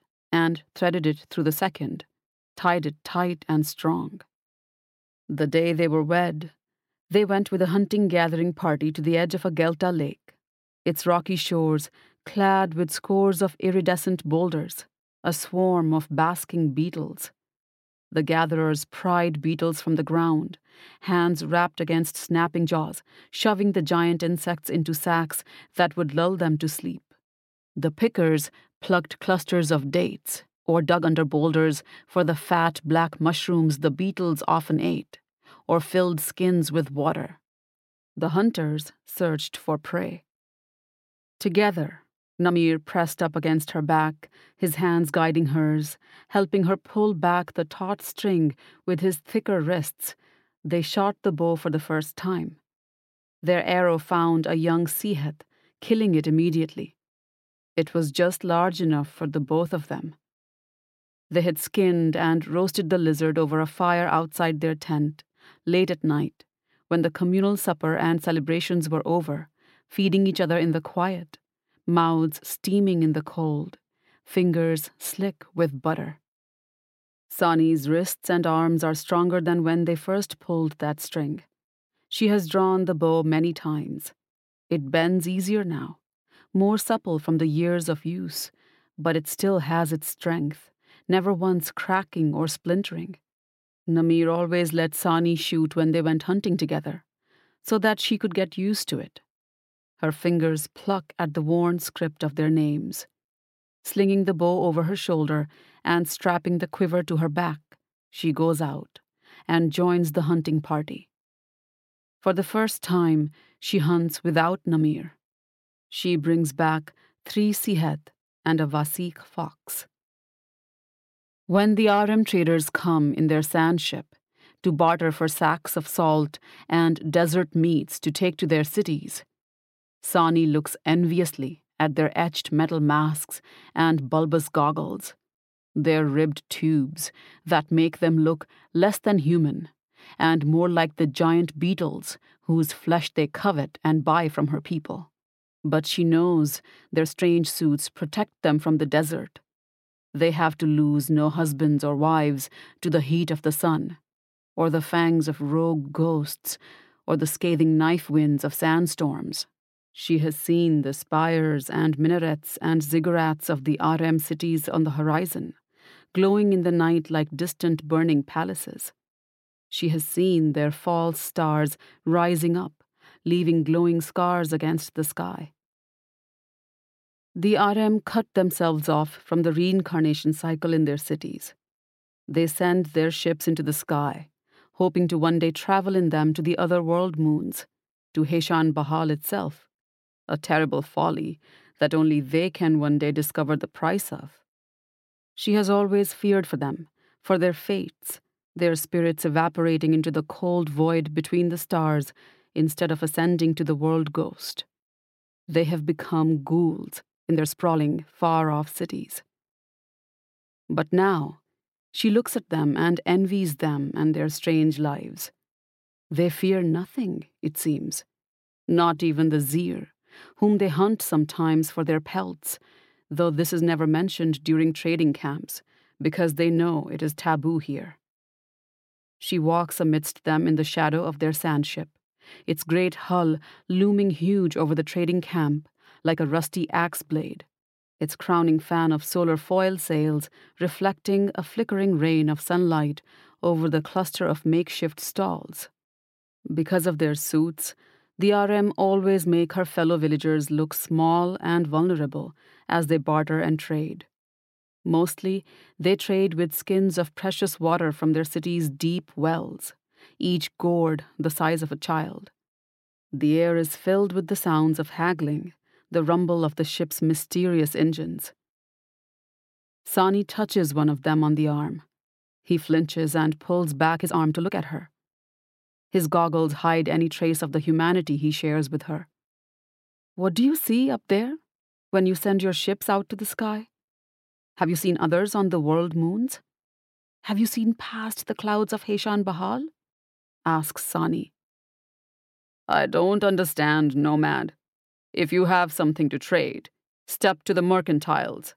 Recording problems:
uneven, jittery; strongly; from 7 s to 4:45

